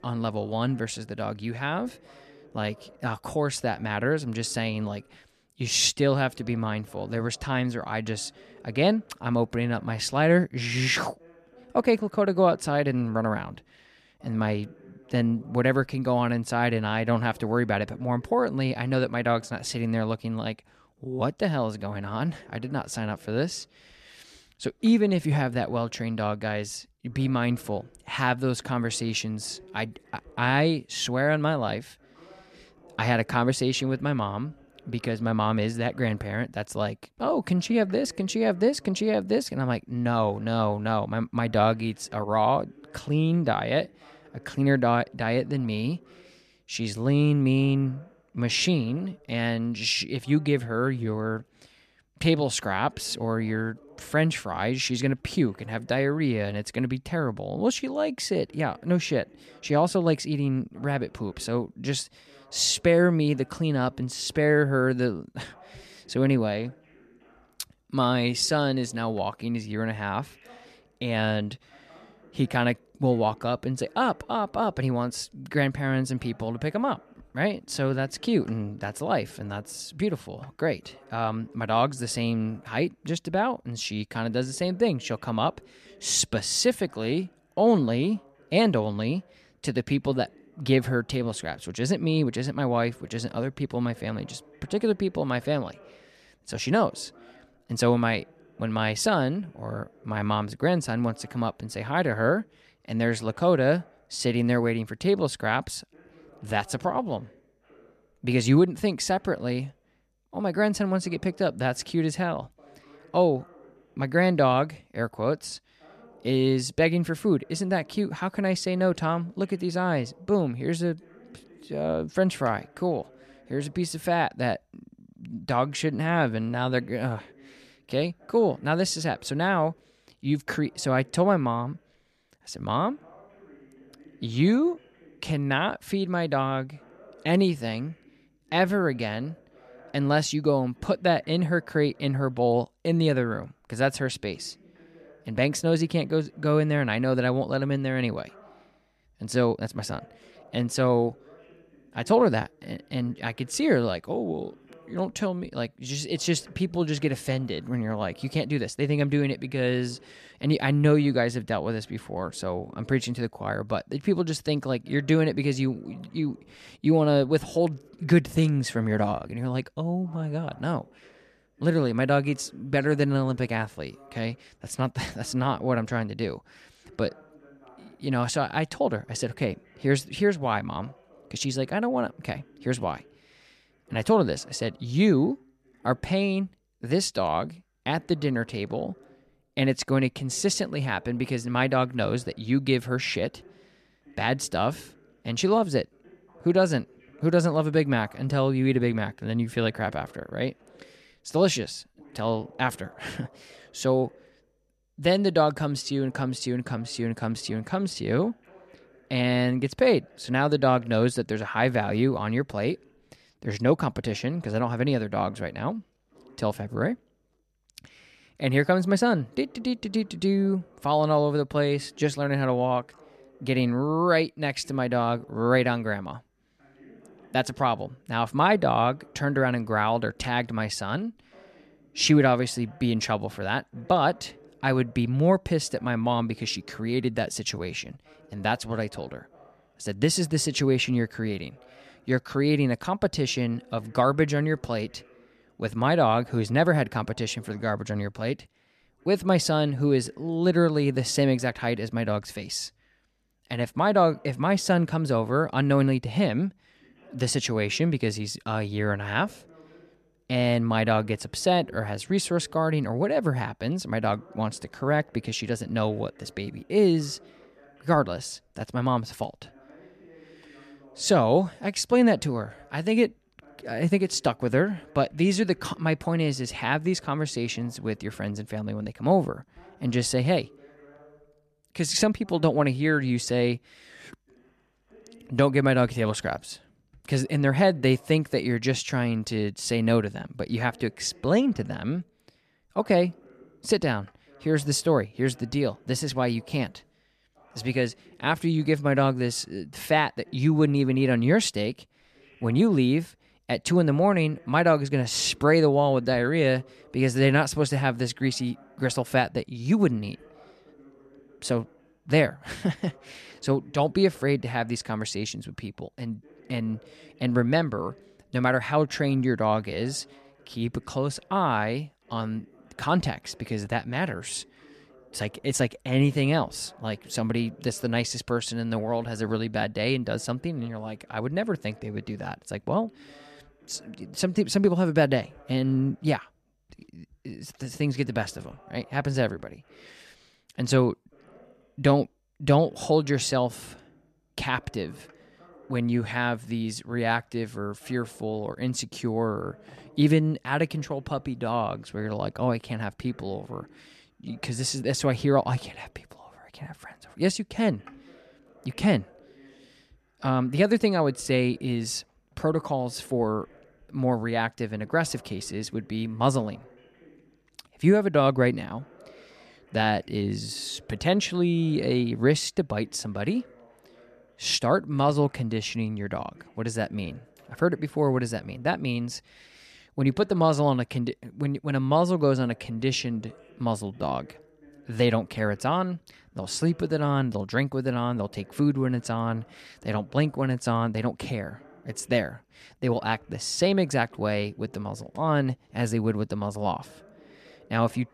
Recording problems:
voice in the background; faint; throughout; 30 dB below the speech

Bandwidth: 14 kHz